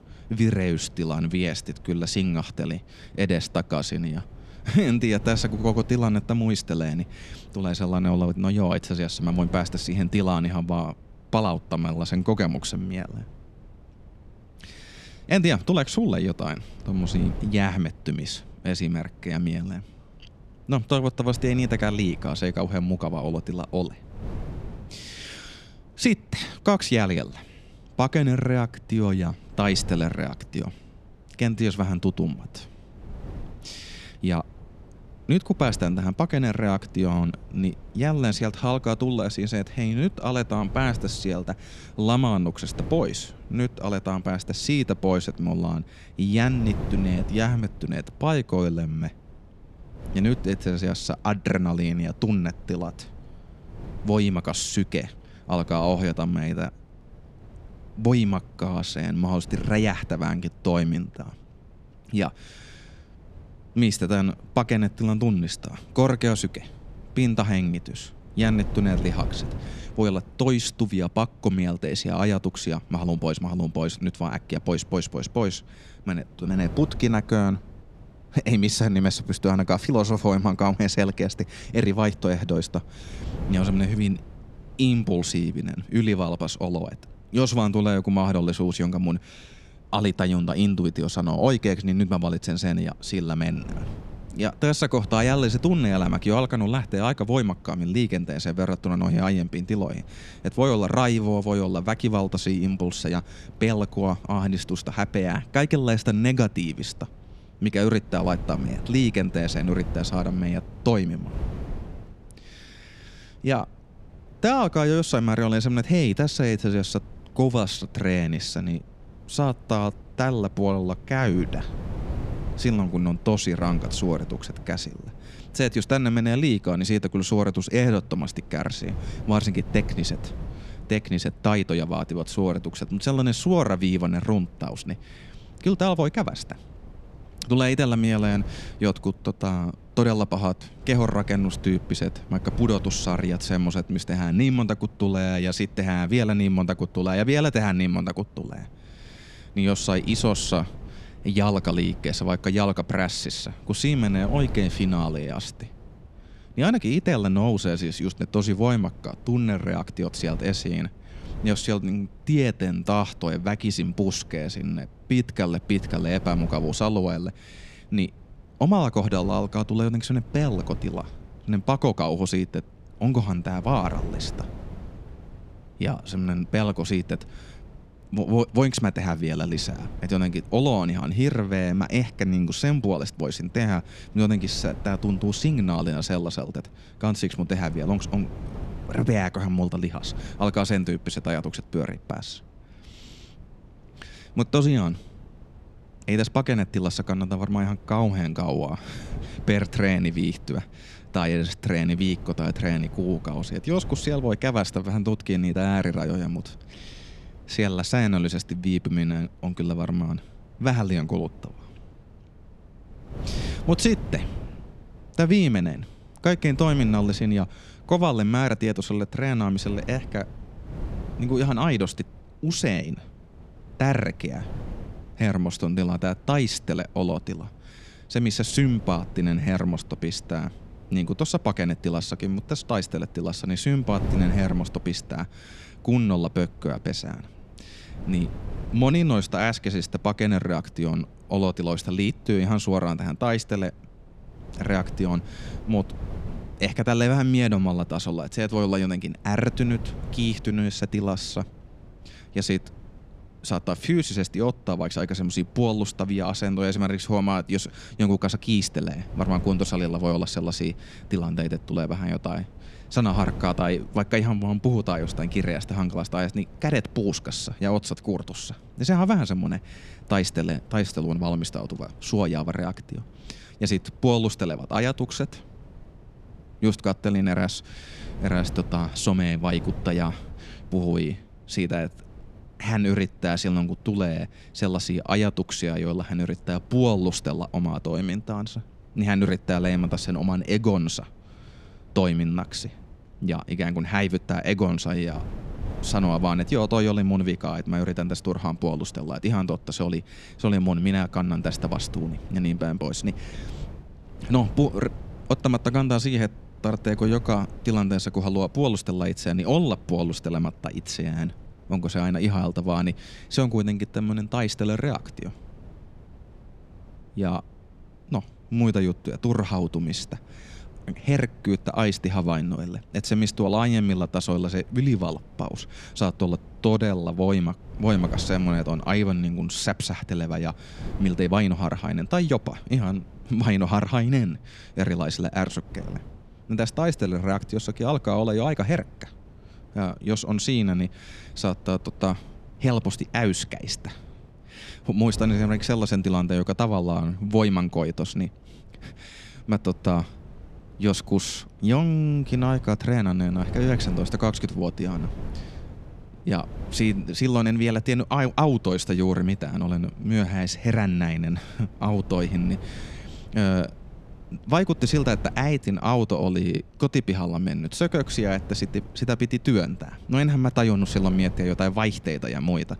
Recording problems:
wind noise on the microphone; occasional gusts; 20 dB below the speech

